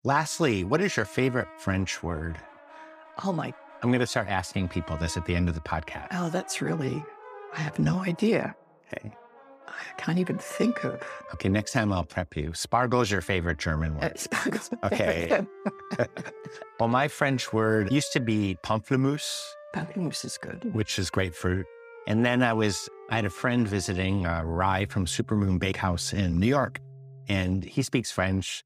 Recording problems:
background music; noticeable; throughout; 20 dB below the speech

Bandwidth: 15 kHz